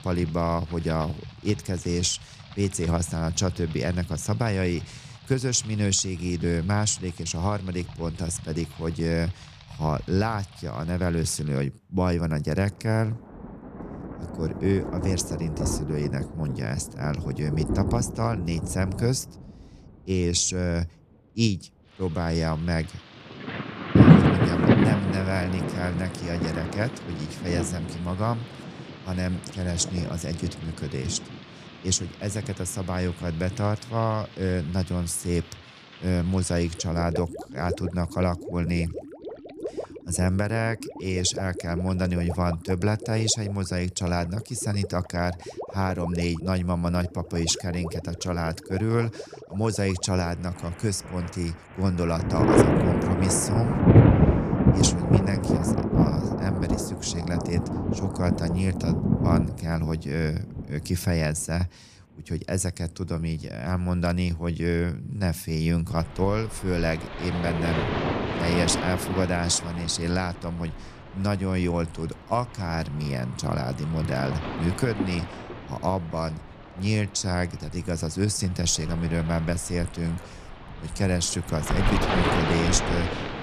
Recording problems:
rain or running water; very loud; throughout; 1 dB above the speech

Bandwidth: 14.5 kHz